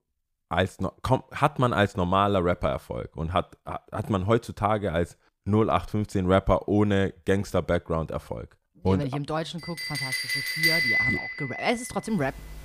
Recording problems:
household noises; very loud; from 9.5 s on; 1 dB above the speech

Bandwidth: 15 kHz